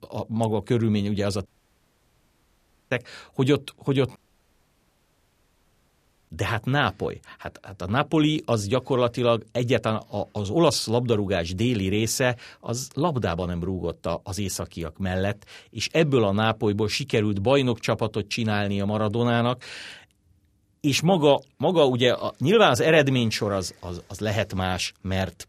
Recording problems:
audio cutting out; at 1.5 s for 1.5 s and at 4 s for 2 s

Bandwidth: 14.5 kHz